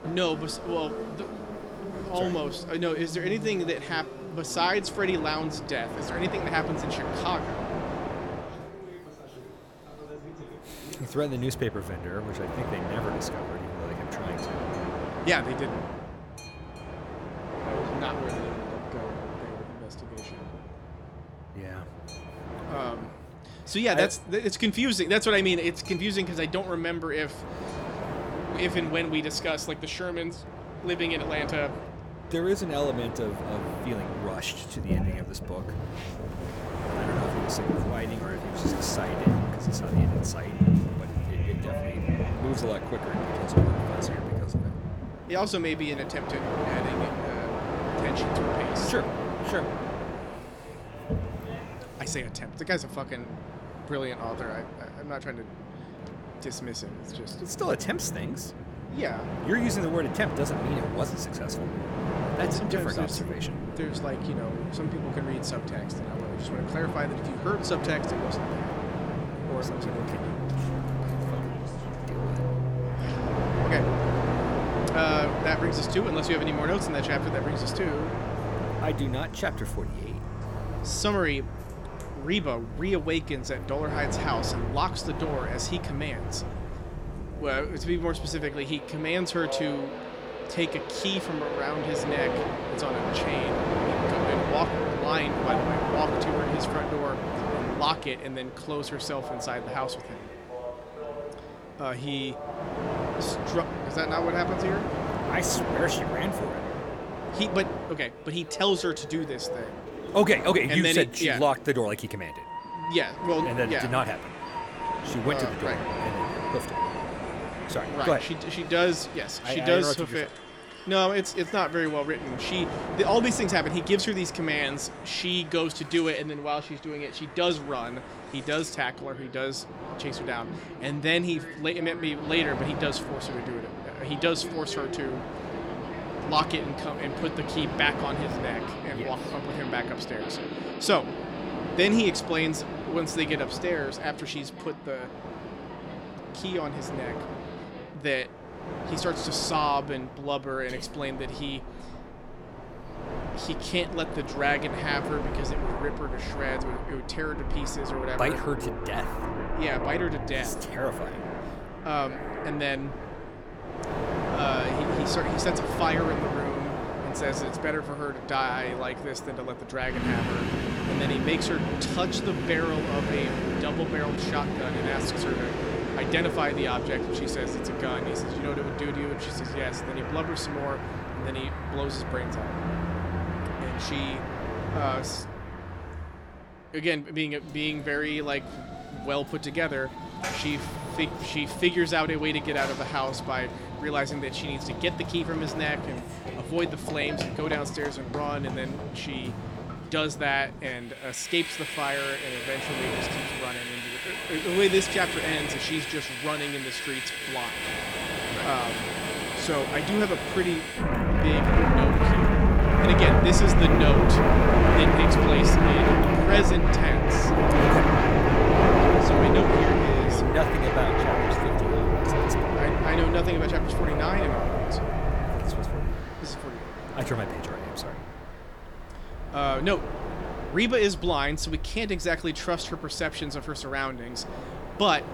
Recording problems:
train or aircraft noise; very loud; throughout; as loud as the speech

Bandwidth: 18.5 kHz